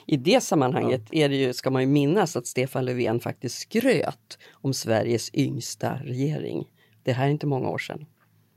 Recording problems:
none

